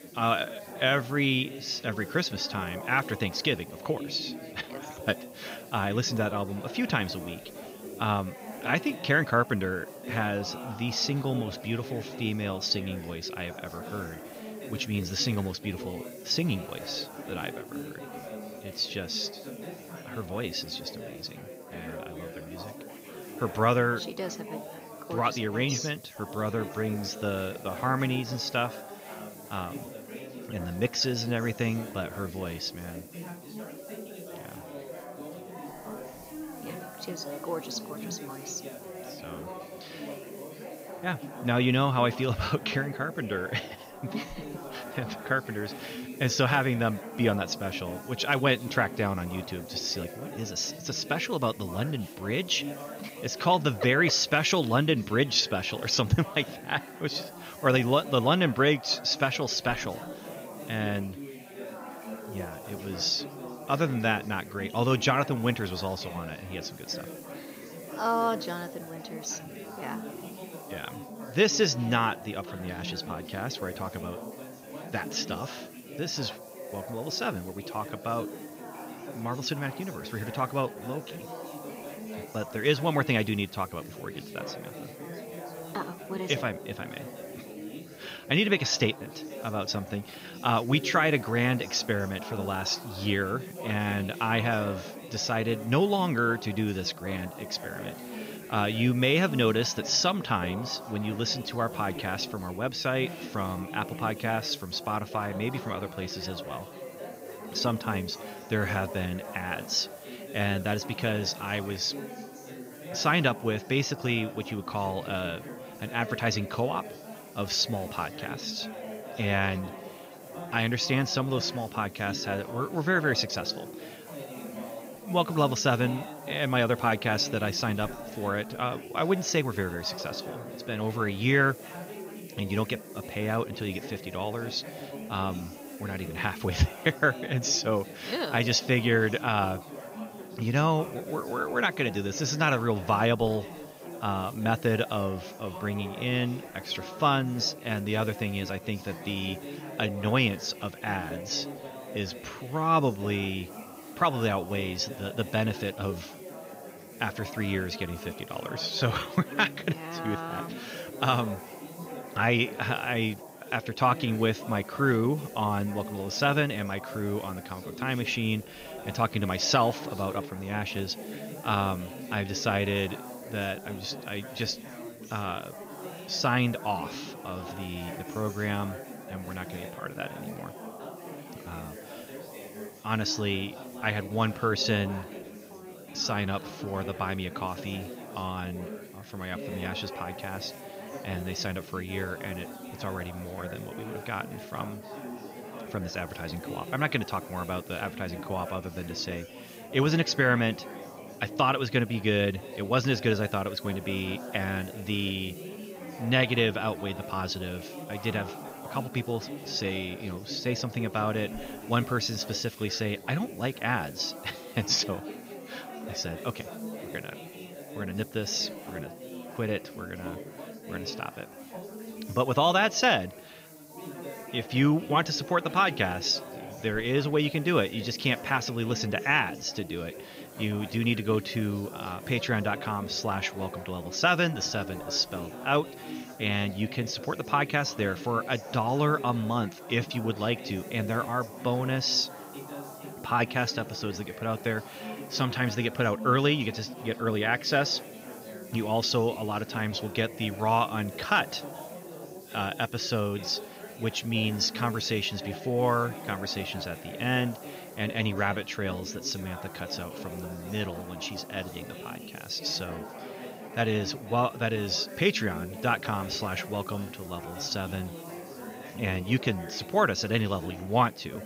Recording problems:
high frequencies cut off; noticeable; nothing above 7 kHz
chatter from many people; noticeable; throughout; 15 dB below the speech
hiss; faint; throughout; 25 dB below the speech

